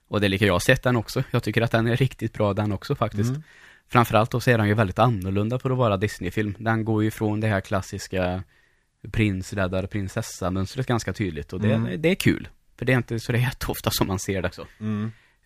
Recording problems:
none

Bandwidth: 15 kHz